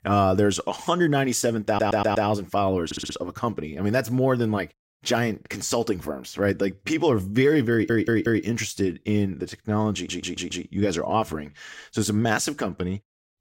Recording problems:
audio stuttering; 4 times, first at 1.5 s

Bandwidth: 16 kHz